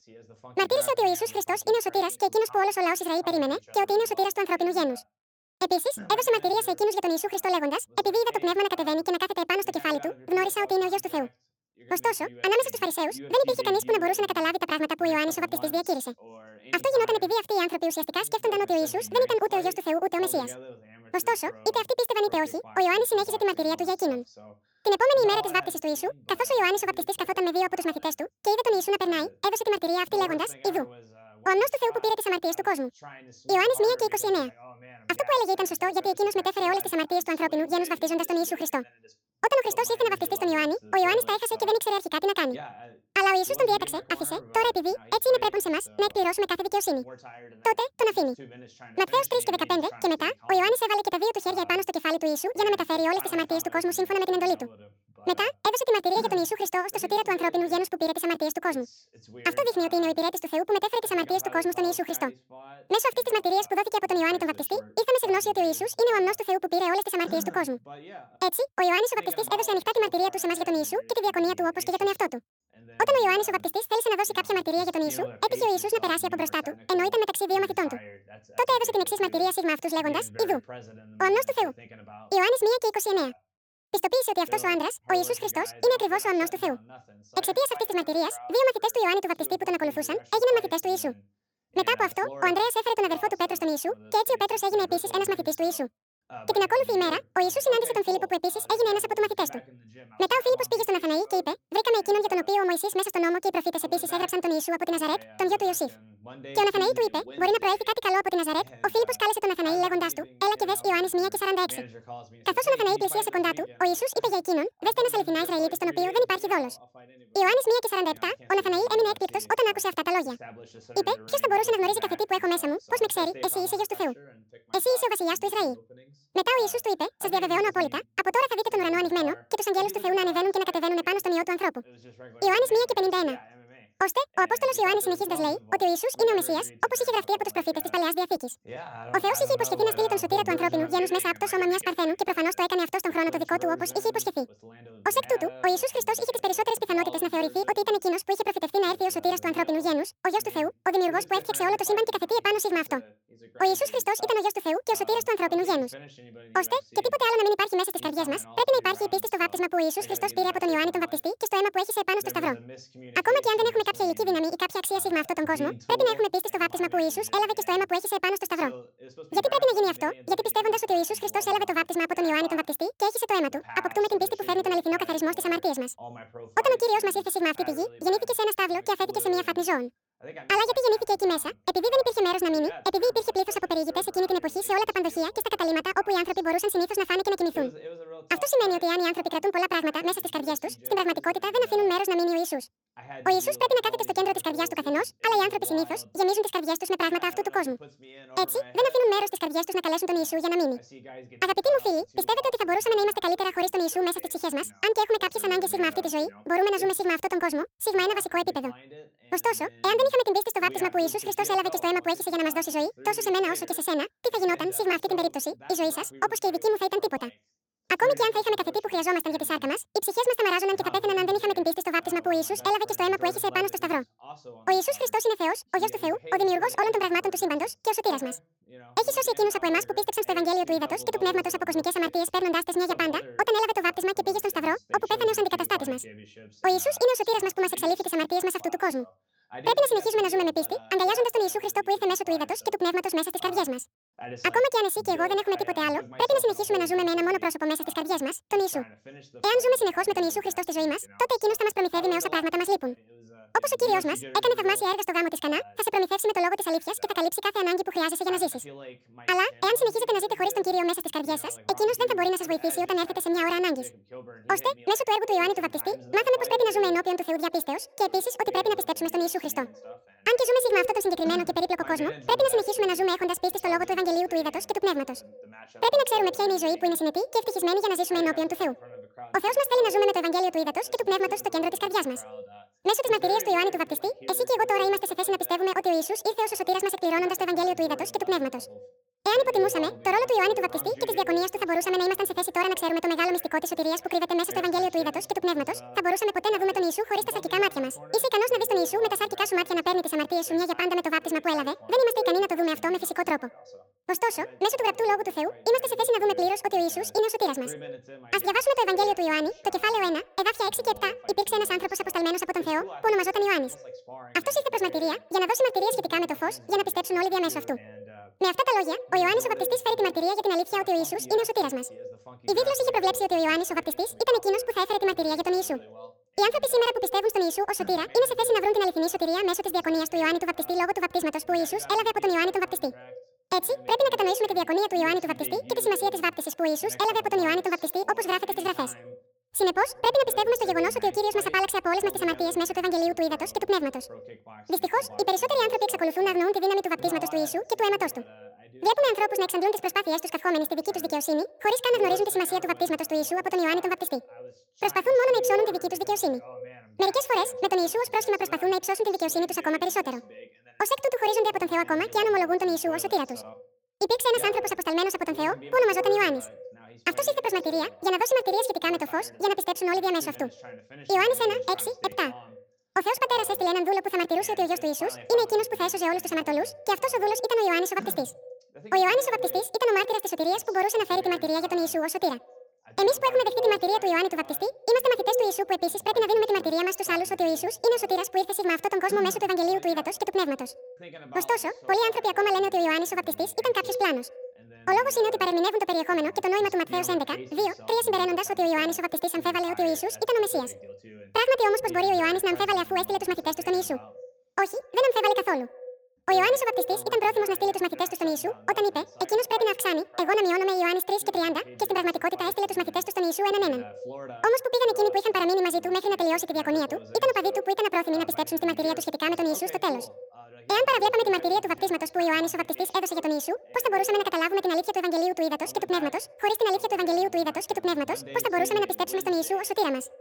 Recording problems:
wrong speed and pitch; too fast and too high; 1.7 times normal speed
echo of what is said; noticeable; from 4:25 on; 80 ms later, 15 dB below the speech
voice in the background; faint; throughout; 20 dB below the speech

